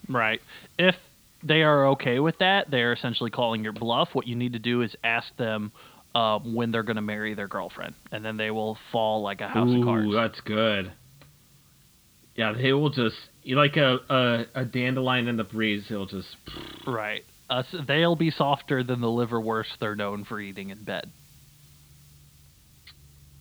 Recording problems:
high frequencies cut off; severe; nothing above 4.5 kHz
hiss; faint; throughout; 30 dB below the speech

